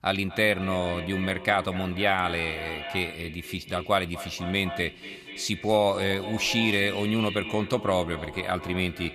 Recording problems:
echo of what is said; strong; throughout; 240 ms later, 10 dB below the speech

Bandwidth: 14 kHz